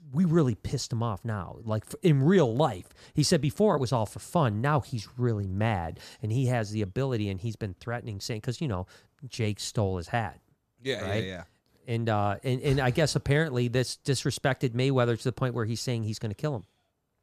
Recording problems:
none

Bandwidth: 14.5 kHz